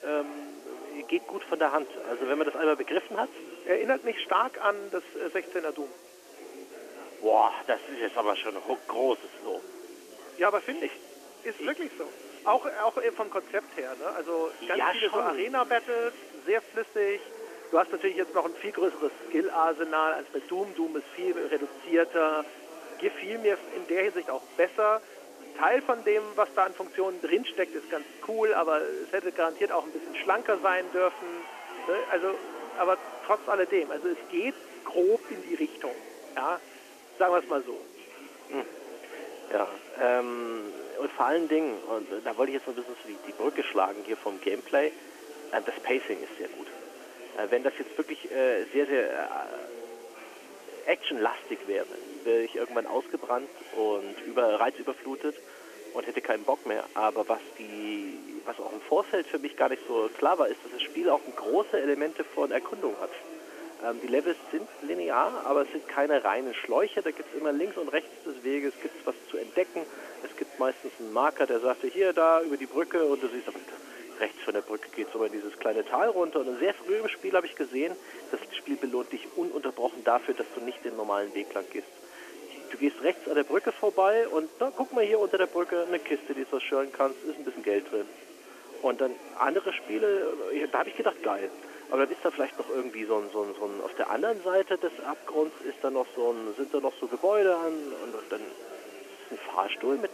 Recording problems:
phone-call audio; nothing above 3 kHz
chatter from many people; noticeable; throughout; 15 dB below the speech
hiss; faint; throughout; 25 dB below the speech

